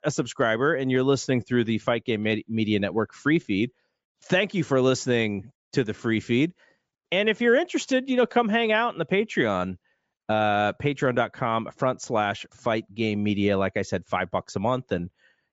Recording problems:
high frequencies cut off; noticeable; nothing above 8 kHz

